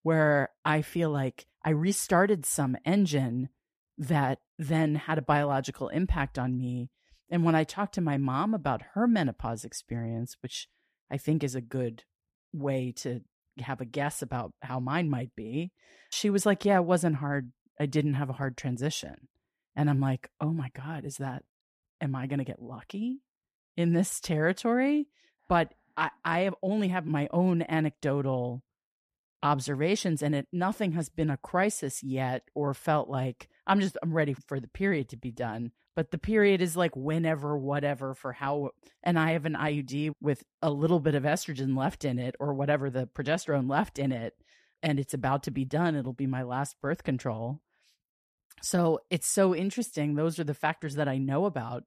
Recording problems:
none

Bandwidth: 14.5 kHz